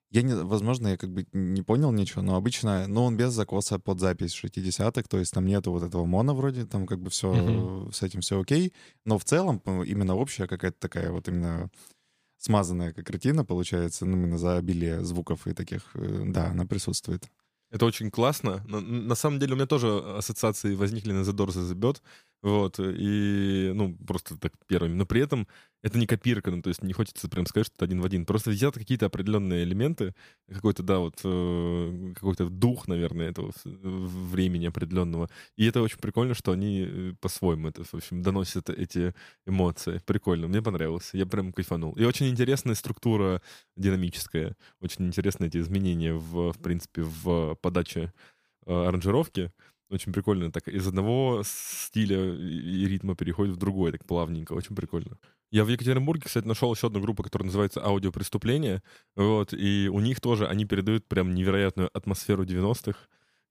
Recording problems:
none

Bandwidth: 15 kHz